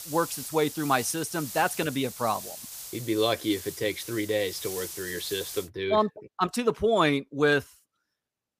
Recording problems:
hiss; noticeable; until 5.5 s; 10 dB below the speech

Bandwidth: 15 kHz